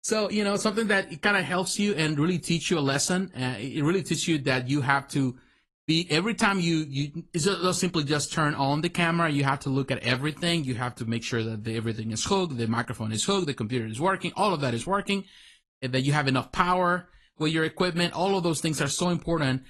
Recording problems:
garbled, watery; slightly; nothing above 11.5 kHz

